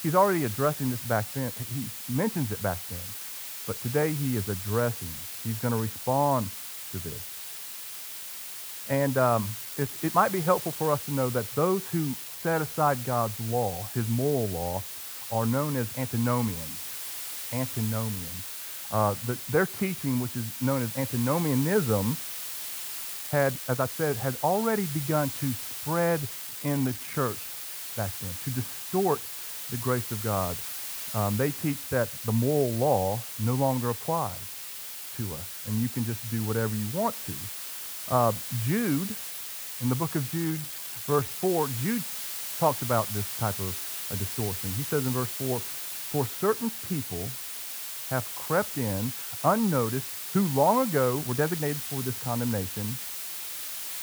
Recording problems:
muffled; very; fading above 1 kHz
hiss; loud; throughout; 5 dB below the speech
uneven, jittery; strongly; from 9.5 to 52 s

